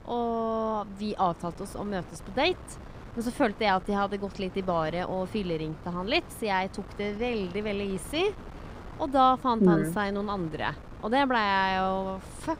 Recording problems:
wind noise on the microphone; occasional gusts; 20 dB below the speech

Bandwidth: 15.5 kHz